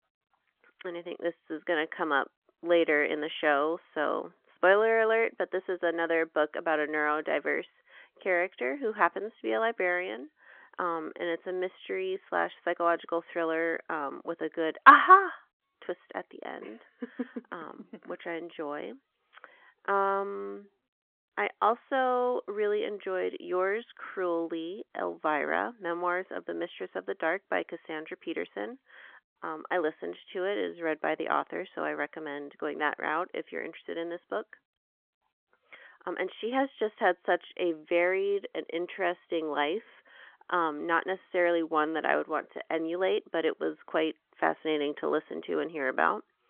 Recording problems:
phone-call audio

